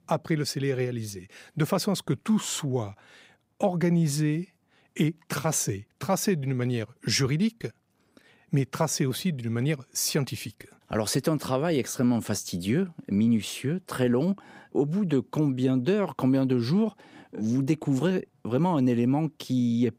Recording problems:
none

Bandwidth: 15.5 kHz